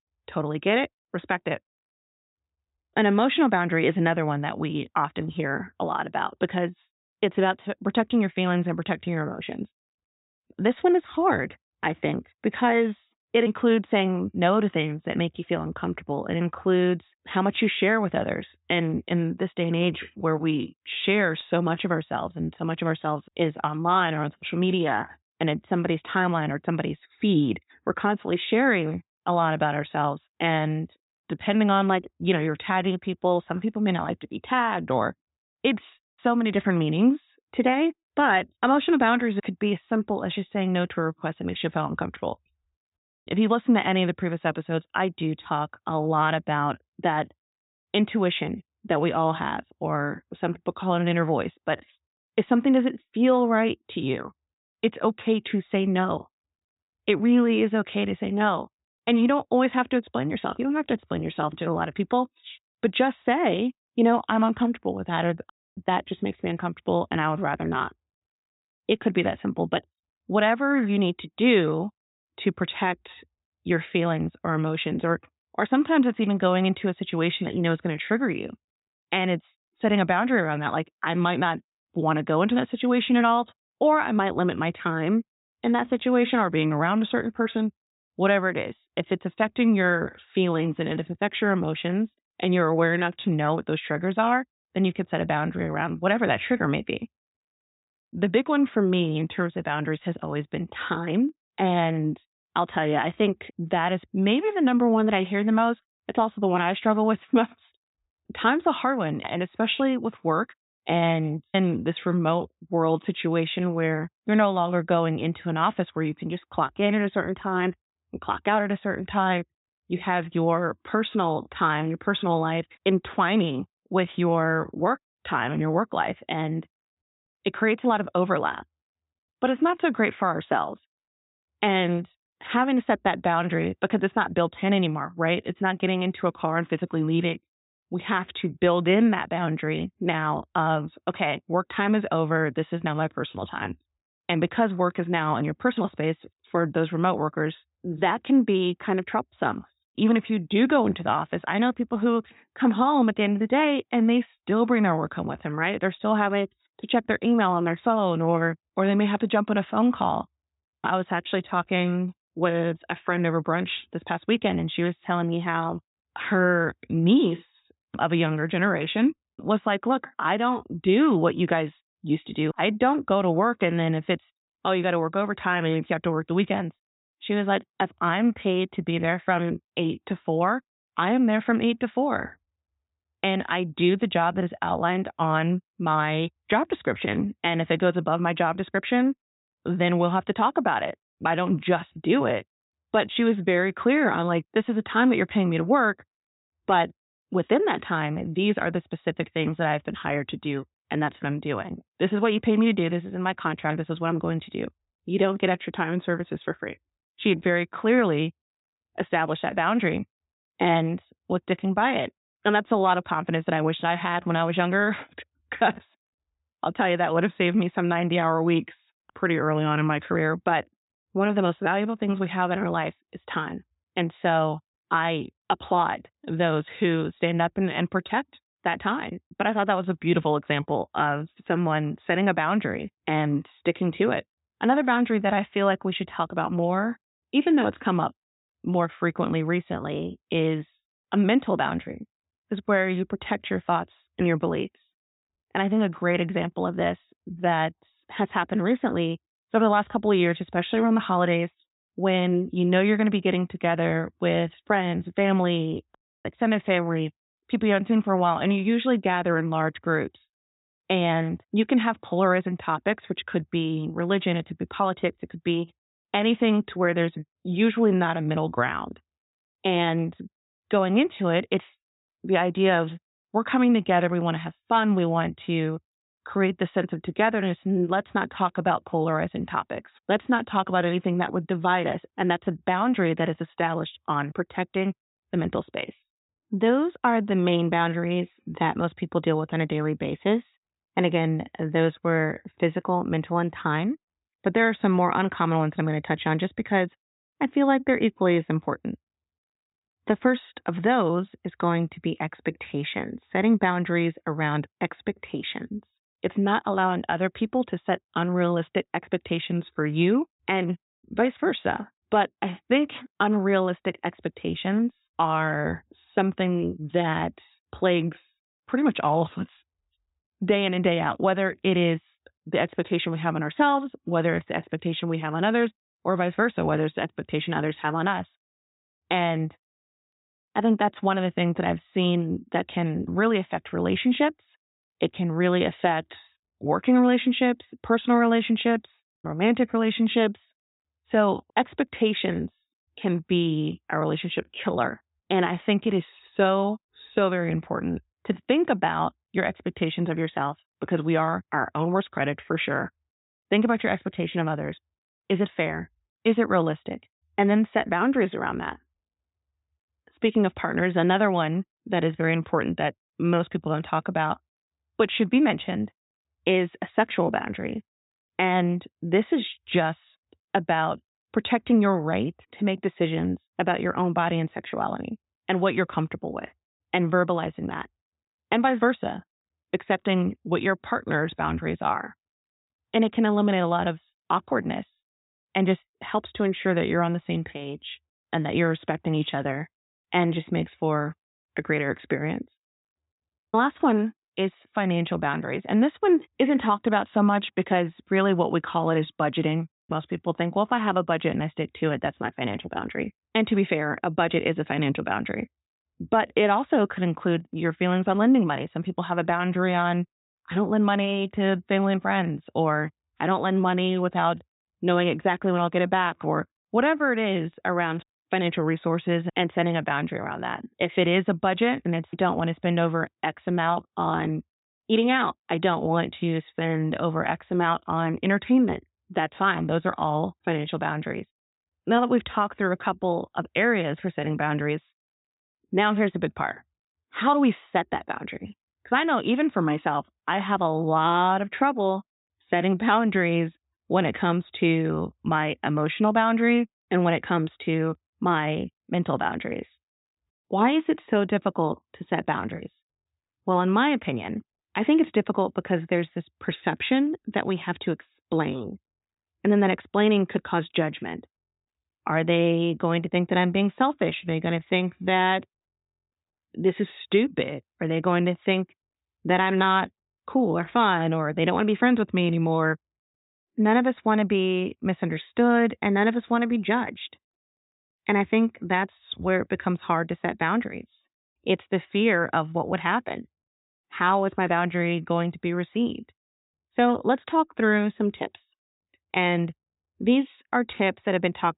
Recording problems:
high frequencies cut off; severe; nothing above 4 kHz

